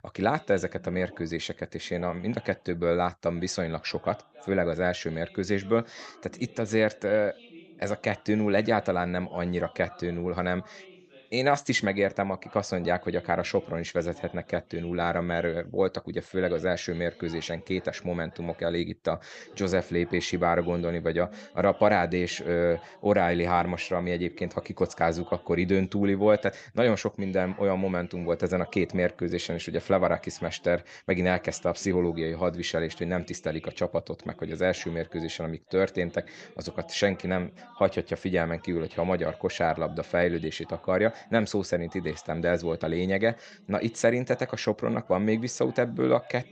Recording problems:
voice in the background; faint; throughout; 25 dB below the speech

